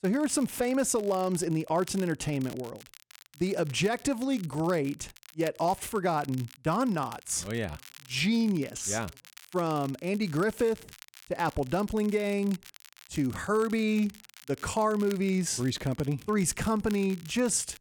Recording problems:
crackle, like an old record; faint; 20 dB below the speech

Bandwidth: 17.5 kHz